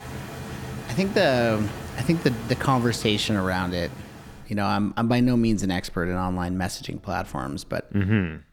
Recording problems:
rain or running water; noticeable; throughout; 15 dB below the speech

